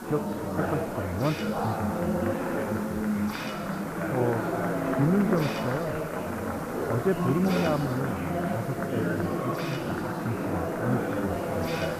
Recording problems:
muffled; very; fading above 2.5 kHz
murmuring crowd; very loud; throughout; 1 dB above the speech
hiss; noticeable; throughout; 10 dB below the speech

